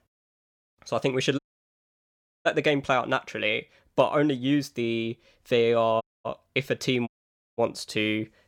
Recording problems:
audio cutting out; at 1.5 s for 1 s, at 6 s and at 7 s

